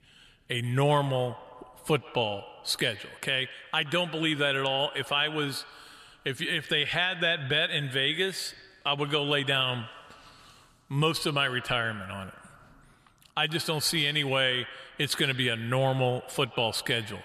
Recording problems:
echo of what is said; noticeable; throughout; 120 ms later, 15 dB below the speech

